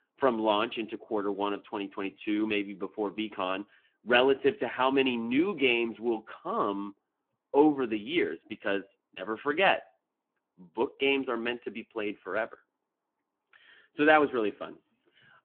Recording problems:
phone-call audio

